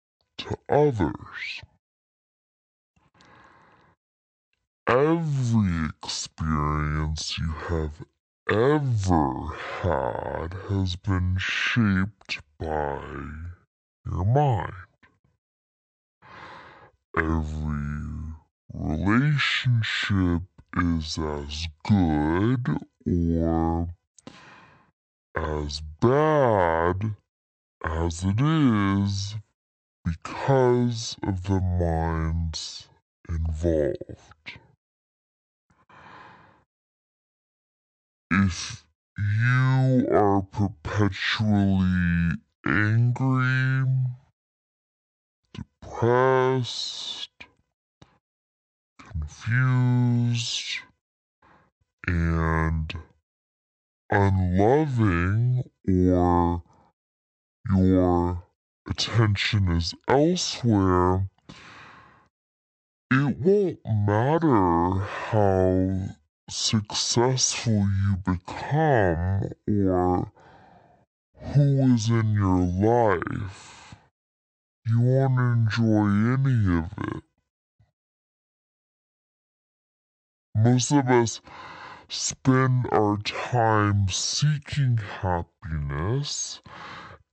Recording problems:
wrong speed and pitch; too slow and too low; 0.5 times normal speed

